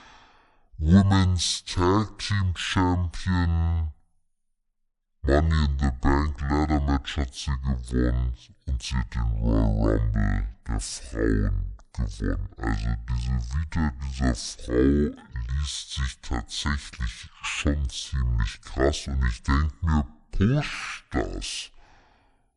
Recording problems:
wrong speed and pitch; too slow and too low; 0.5 times normal speed

